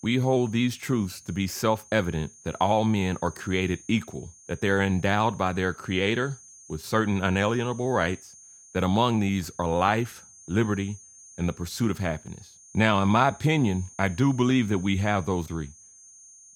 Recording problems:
muffled; slightly; fading above 4 kHz
high-pitched whine; faint; throughout; 6.5 kHz, 20 dB below the speech

